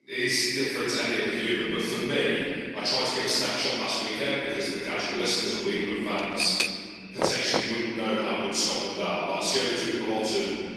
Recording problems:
room echo; strong; dies away in 2.3 s
off-mic speech; far
echo of what is said; faint; throughout; 190 ms later, 20 dB below the speech
garbled, watery; slightly; nothing above 12 kHz
thin; very slightly; fading below 350 Hz
keyboard typing; noticeable; at 6 s; peak level with the speech
door banging; noticeable; at 7 s; peak 2 dB below the speech

